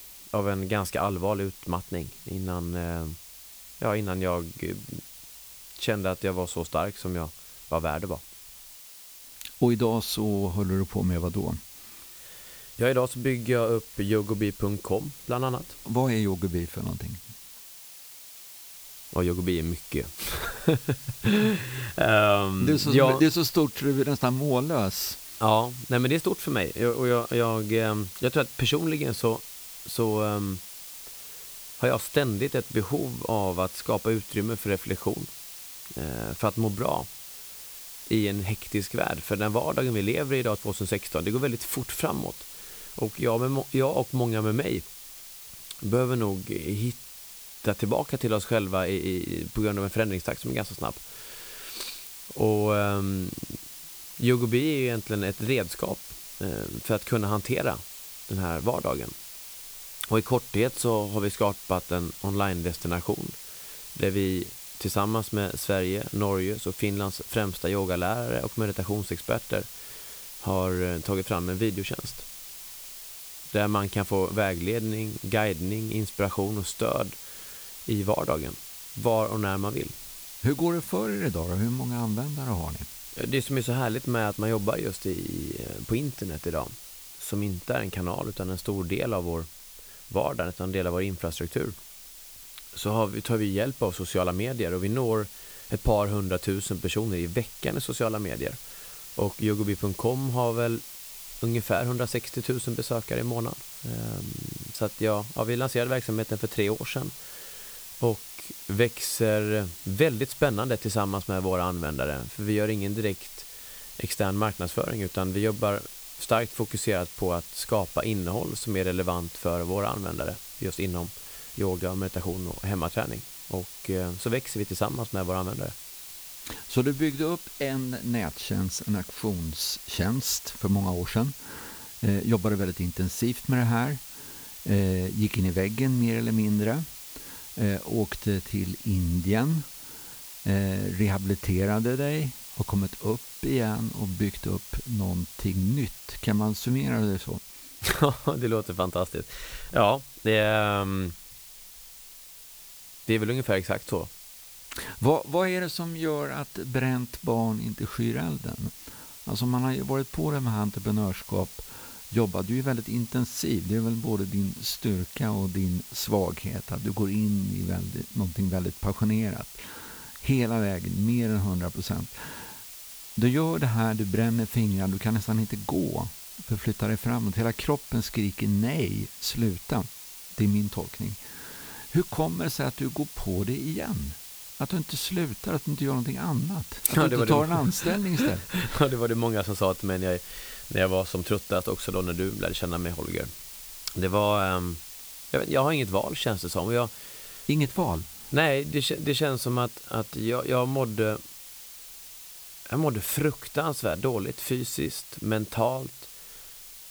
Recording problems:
hiss; noticeable; throughout; 10 dB below the speech

